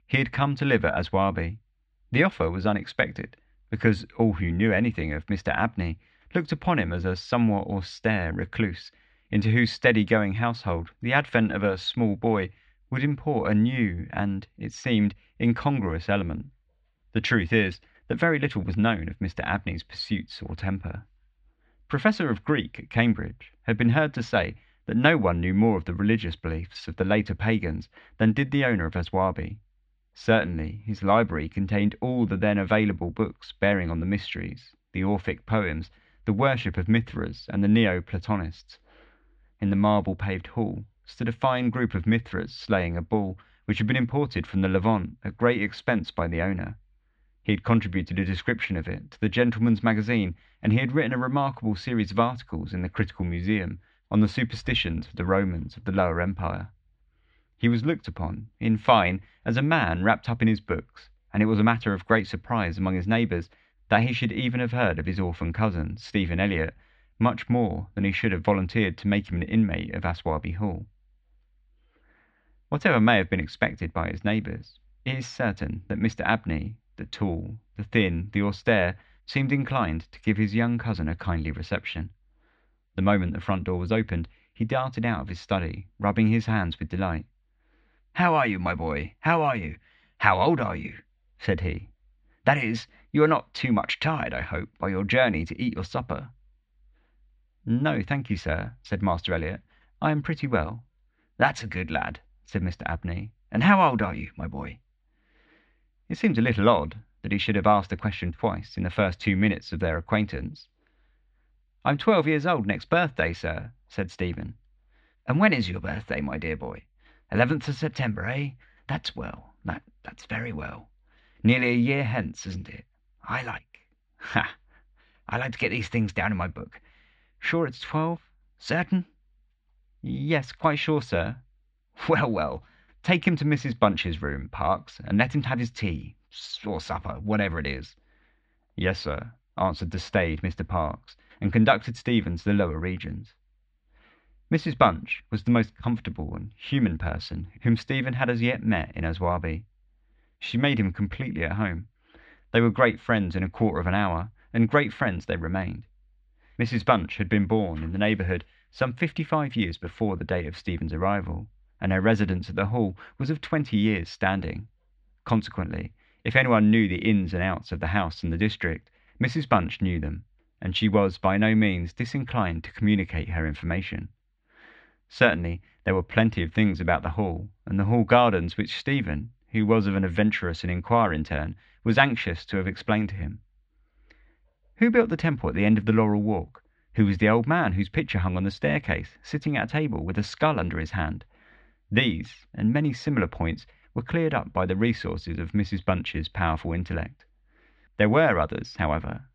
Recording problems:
muffled; slightly; fading above 4 kHz

